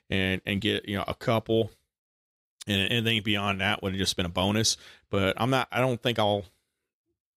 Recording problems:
uneven, jittery; slightly; from 0.5 to 6.5 s

